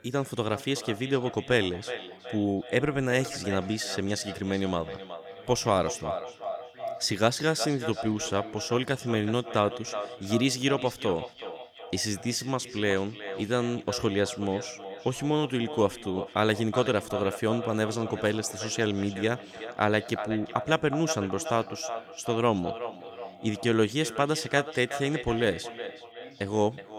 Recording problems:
echo of what is said; strong; throughout; 370 ms later, 10 dB below the speech
voice in the background; faint; throughout; 25 dB below the speech

